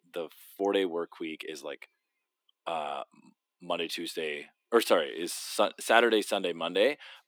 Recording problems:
thin; somewhat; fading below 300 Hz

